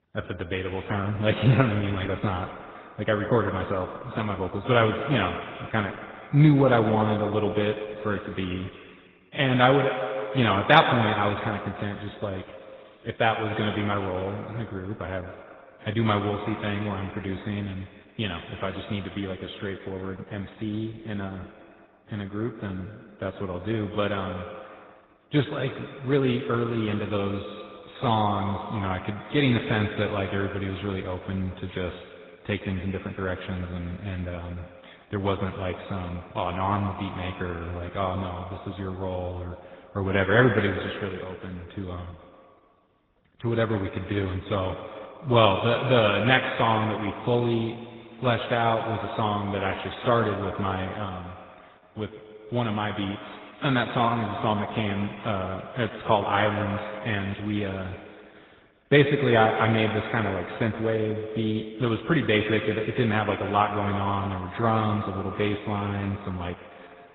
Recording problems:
echo of what is said; strong; throughout; 120 ms later, 9 dB below the speech
garbled, watery; badly; nothing above 3.5 kHz

